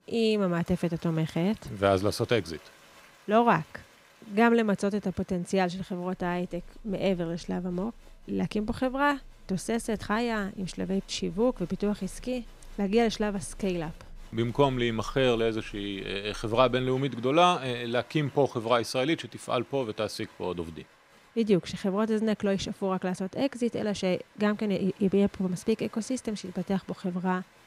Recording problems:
crowd noise; faint; throughout; 25 dB below the speech

